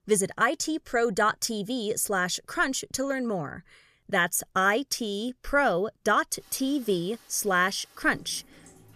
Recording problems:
rain or running water; faint; from 6.5 s on; 25 dB below the speech

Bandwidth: 14.5 kHz